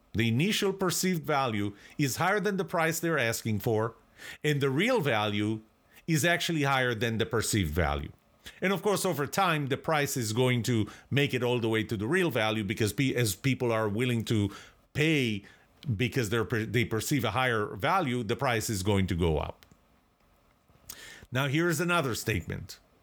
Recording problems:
none

